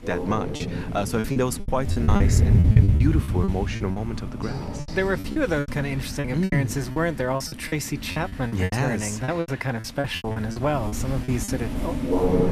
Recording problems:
animal sounds; very loud; throughout; 1 dB above the speech
choppy; very; 15% of the speech affected

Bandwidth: 14.5 kHz